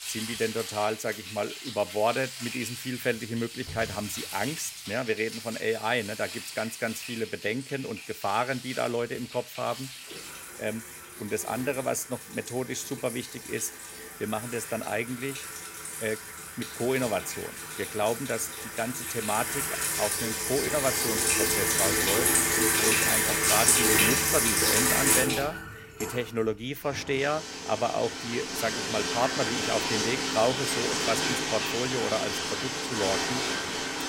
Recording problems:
household noises; very loud; throughout; 4 dB above the speech

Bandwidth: 16 kHz